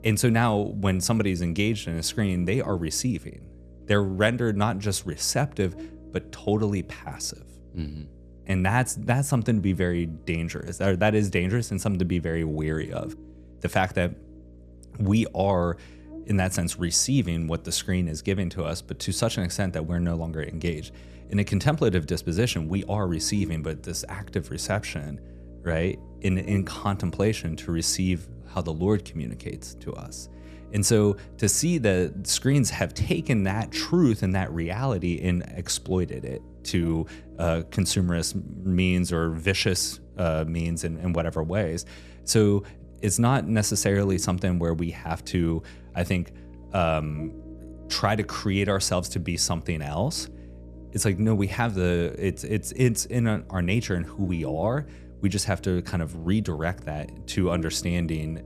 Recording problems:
electrical hum; faint; throughout; 60 Hz, 20 dB below the speech

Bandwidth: 14 kHz